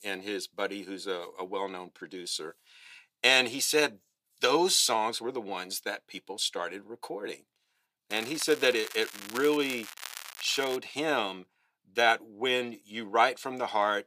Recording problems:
thin; somewhat; fading below 350 Hz
crackling; noticeable; from 8 to 11 s; 15 dB below the speech

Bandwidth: 15 kHz